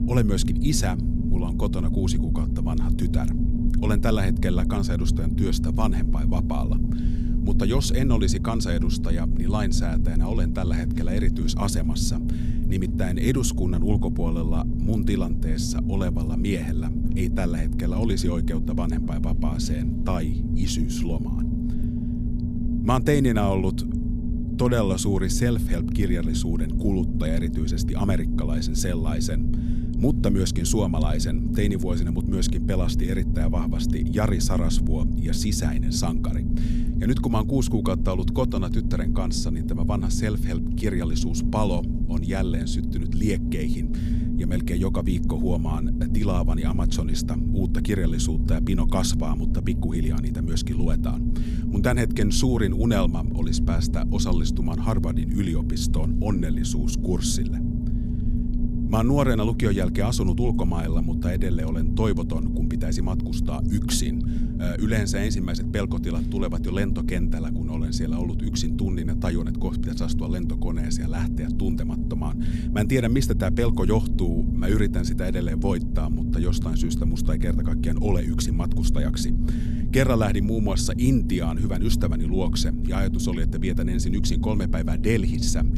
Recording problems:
low rumble; loud; throughout; 4 dB below the speech

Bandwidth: 14.5 kHz